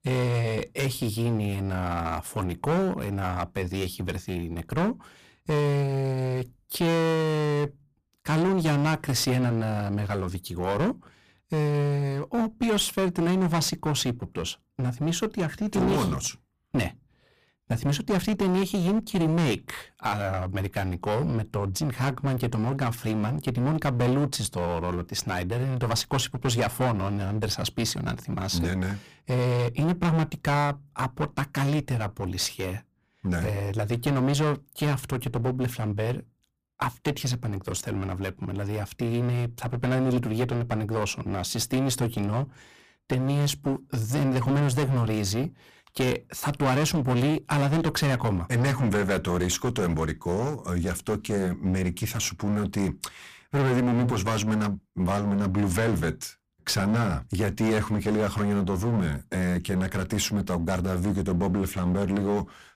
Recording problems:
distortion; heavy; 15% of the sound clipped

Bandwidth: 15 kHz